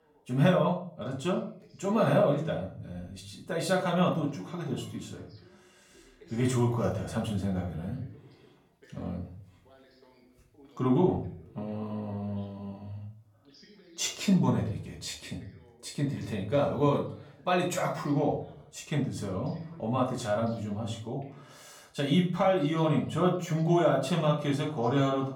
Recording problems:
off-mic speech; far
room echo; slight; dies away in 0.4 s
voice in the background; faint; throughout; 30 dB below the speech

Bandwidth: 17.5 kHz